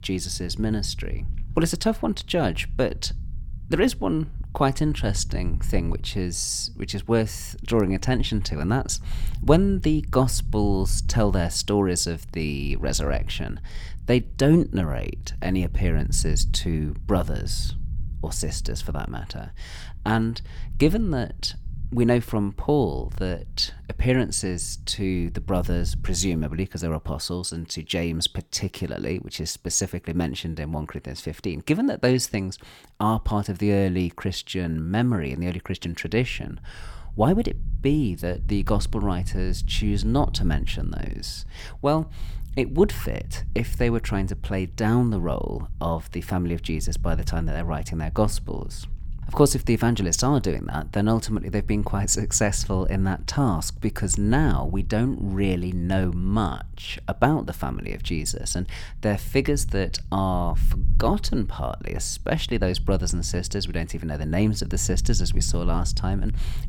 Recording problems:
low rumble; faint; until 27 s and from 36 s on; 25 dB below the speech

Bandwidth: 18 kHz